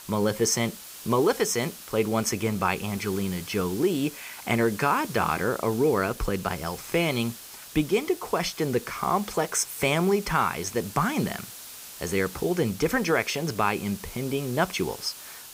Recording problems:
hiss; noticeable; throughout; 15 dB below the speech

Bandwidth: 15.5 kHz